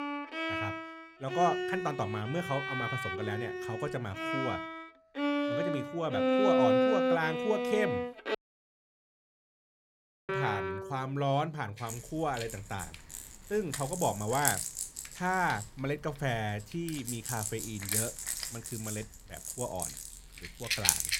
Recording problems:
background music; very loud; throughout; 1 dB above the speech
audio cutting out; at 8.5 s for 2 s

